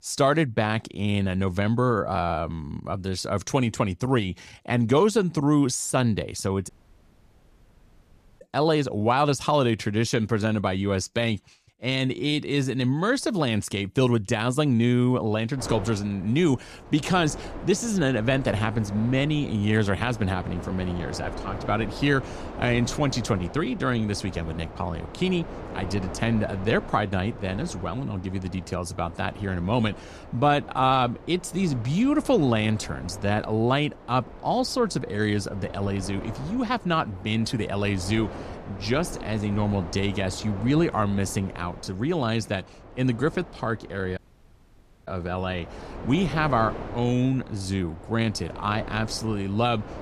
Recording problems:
wind noise on the microphone; occasional gusts; from 16 s on; 15 dB below the speech
audio cutting out; at 6.5 s for 1.5 s and at 44 s for 1 s

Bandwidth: 14.5 kHz